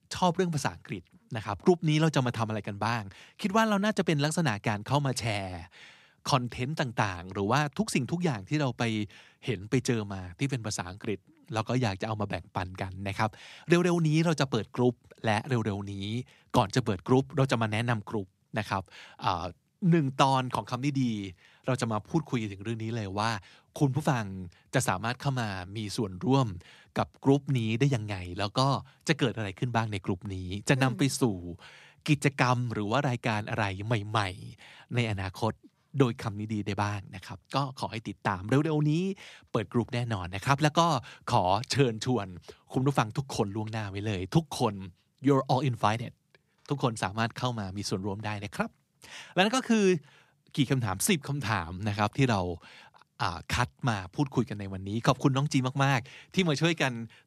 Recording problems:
none

